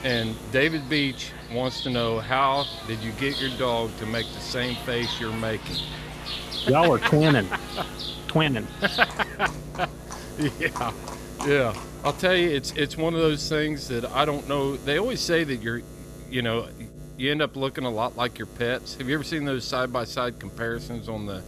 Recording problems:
animal sounds; loud; until 12 s; 9 dB below the speech
electrical hum; noticeable; throughout; 60 Hz, 20 dB below the speech

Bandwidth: 14.5 kHz